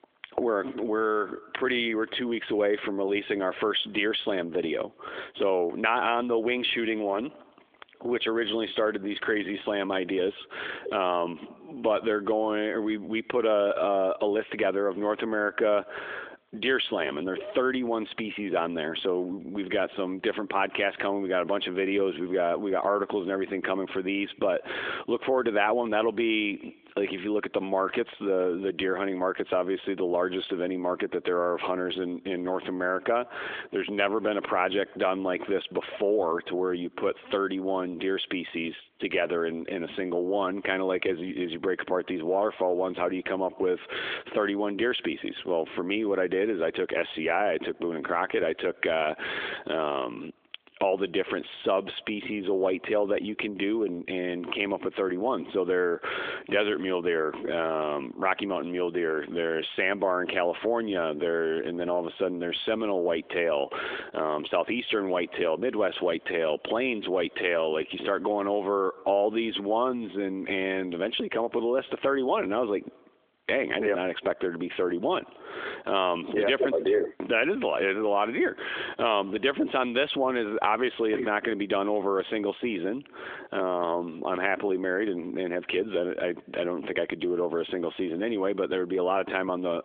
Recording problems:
squashed, flat; heavily
phone-call audio; nothing above 3.5 kHz

